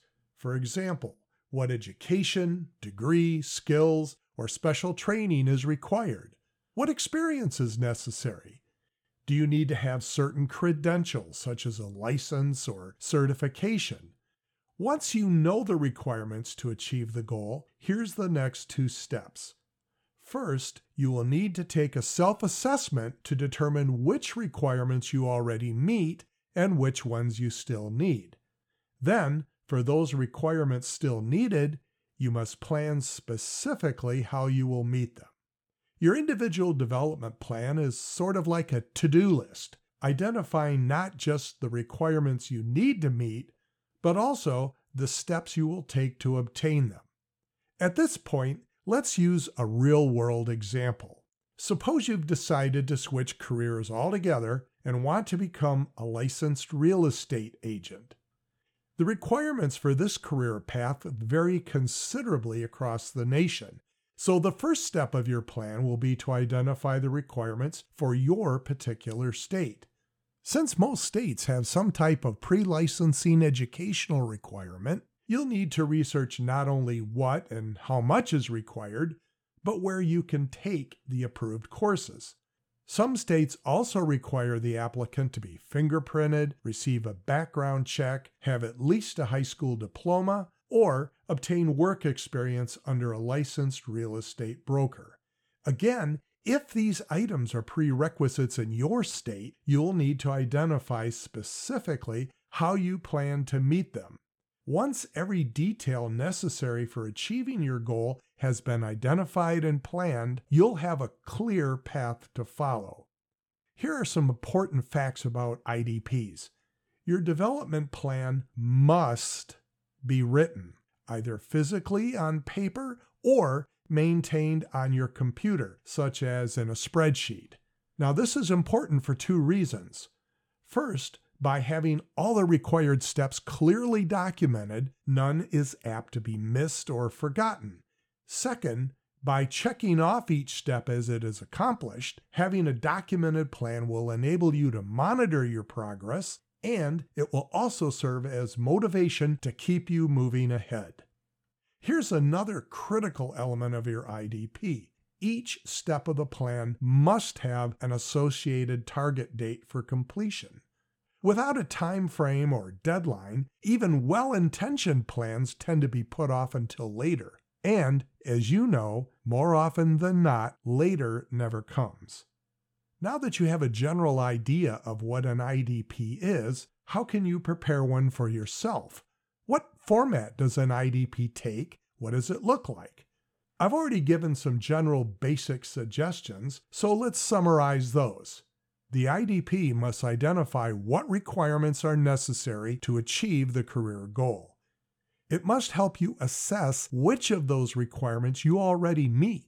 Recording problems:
none

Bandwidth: 17.5 kHz